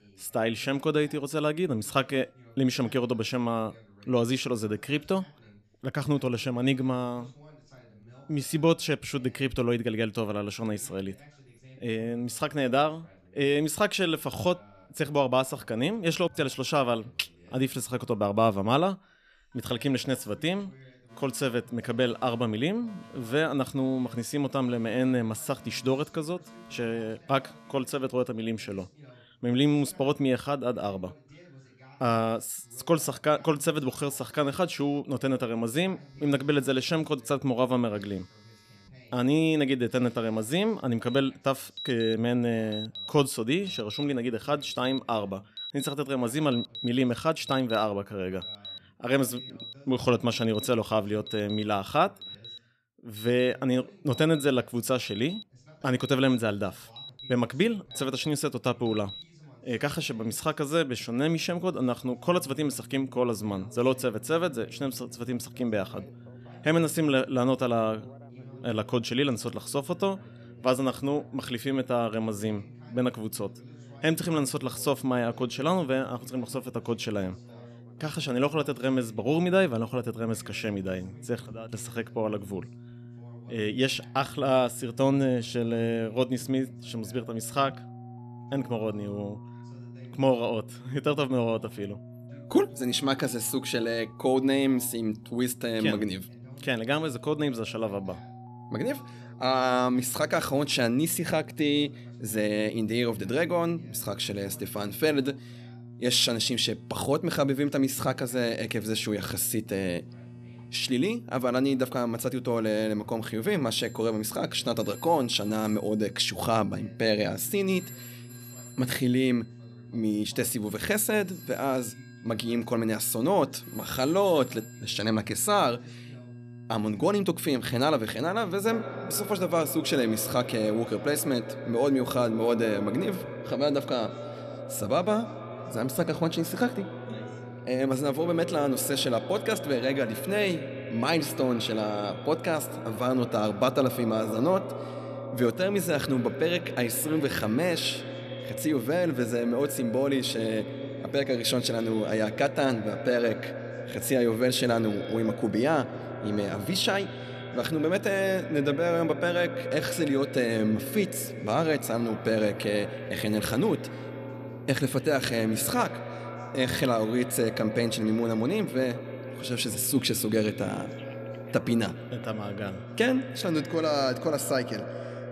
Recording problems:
echo of what is said; strong; from 2:09 on; 140 ms later, 10 dB below the speech
alarms or sirens; noticeable; throughout; 20 dB below the speech
electrical hum; faint; from 1:02 on; 60 Hz, 25 dB below the speech
voice in the background; faint; throughout; 25 dB below the speech

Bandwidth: 14 kHz